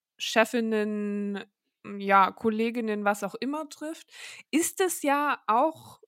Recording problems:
none

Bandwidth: 16 kHz